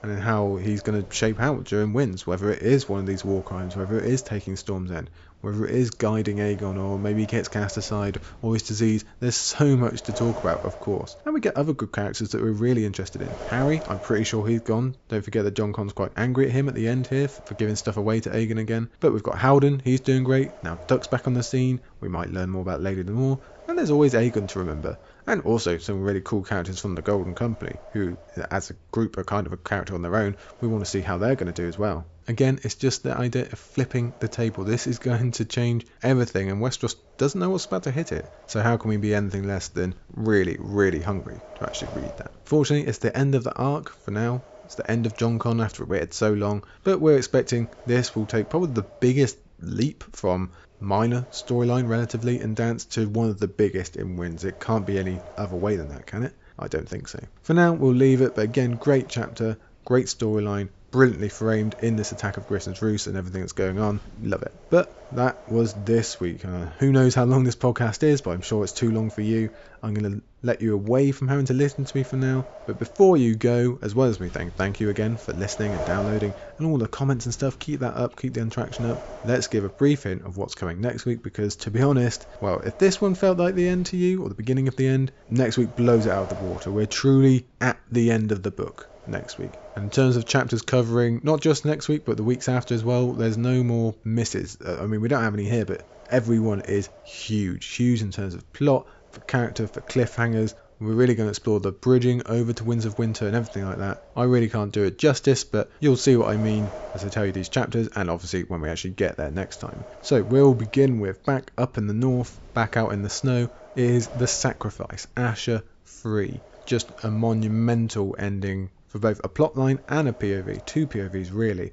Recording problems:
high frequencies cut off; noticeable; nothing above 8 kHz
wind noise on the microphone; occasional gusts; 15 dB below the speech

